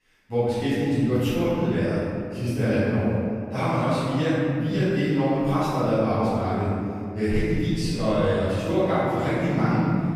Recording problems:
room echo; strong; dies away in 2.3 s
off-mic speech; far

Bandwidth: 15 kHz